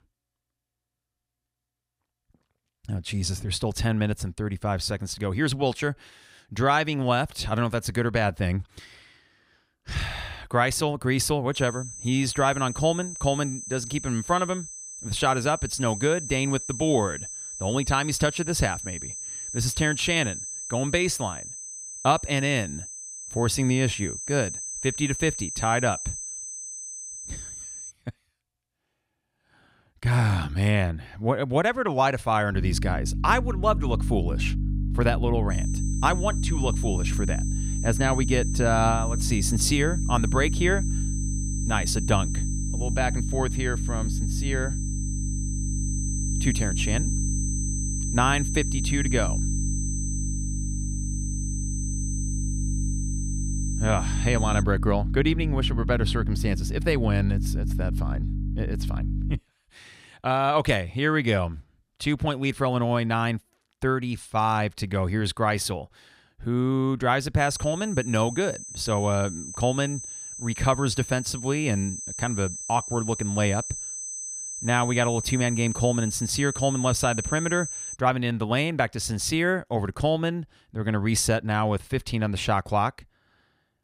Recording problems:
high-pitched whine; loud; from 12 to 28 s, from 36 to 55 s and from 1:07 to 1:18; 6 kHz, 8 dB below the speech
electrical hum; noticeable; from 33 to 59 s; 50 Hz, 15 dB below the speech

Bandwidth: 15.5 kHz